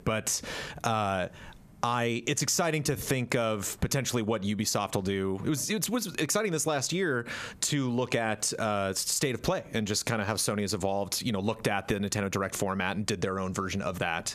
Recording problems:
squashed, flat; heavily

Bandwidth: 14.5 kHz